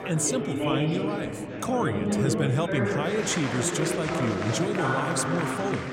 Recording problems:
chatter from many people; very loud; throughout; as loud as the speech

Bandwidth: 16 kHz